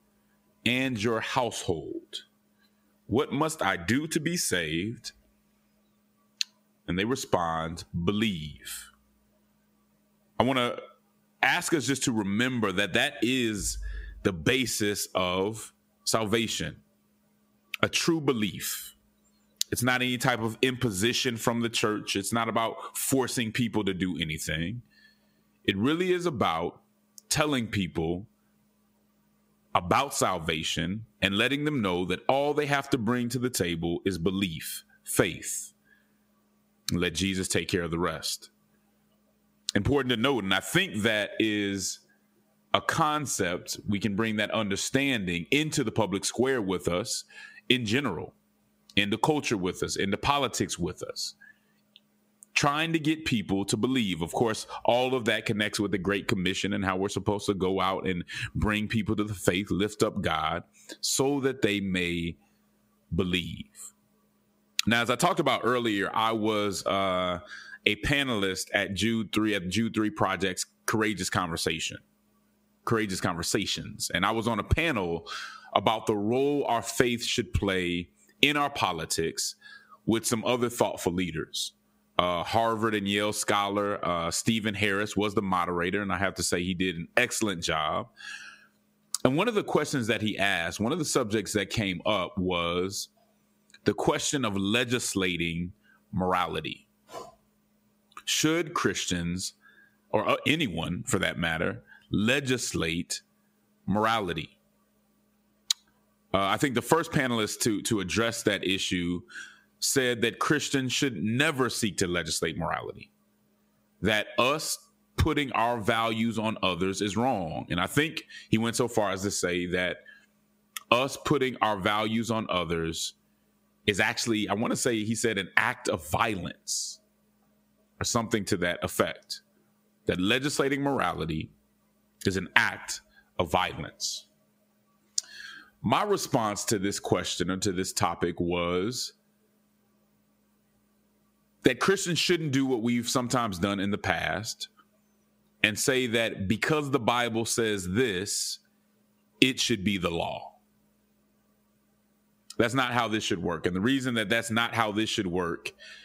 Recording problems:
squashed, flat; heavily

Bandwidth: 15.5 kHz